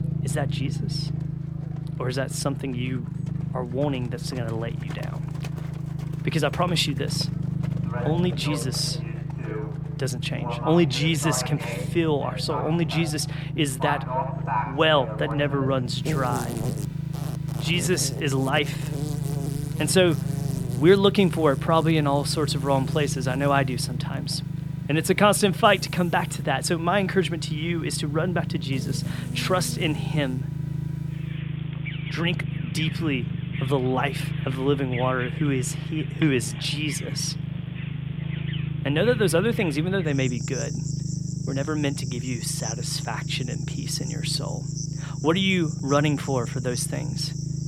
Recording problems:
animal sounds; noticeable; throughout; 15 dB below the speech
low rumble; noticeable; throughout; 15 dB below the speech

